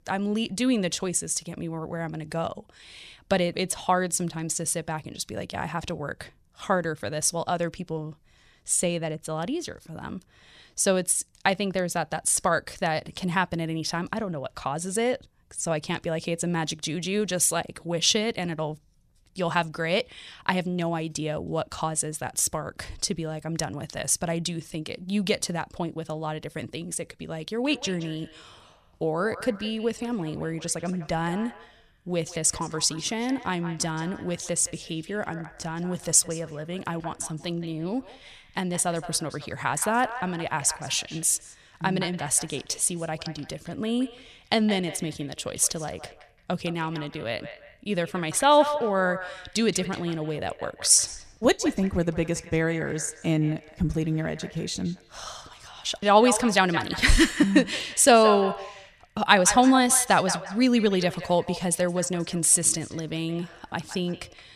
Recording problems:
echo of what is said; noticeable; from 28 s on; 170 ms later, 15 dB below the speech

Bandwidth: 14.5 kHz